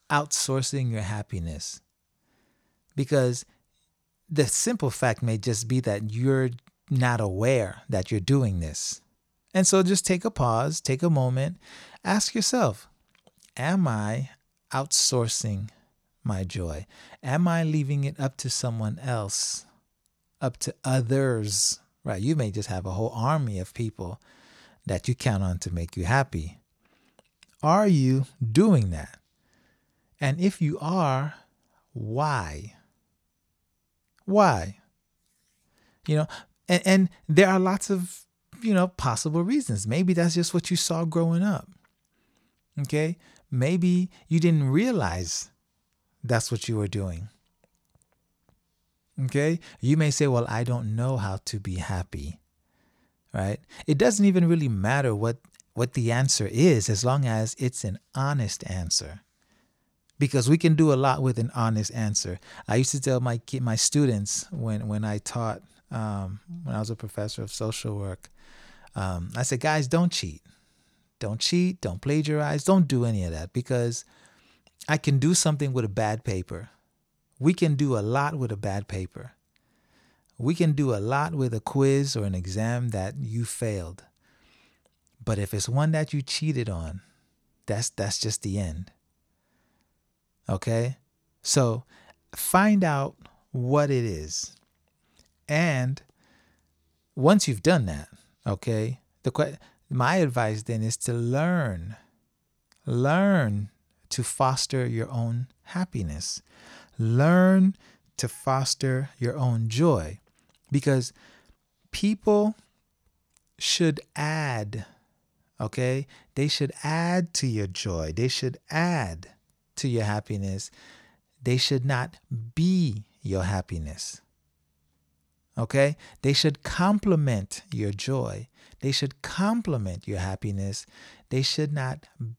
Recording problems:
none

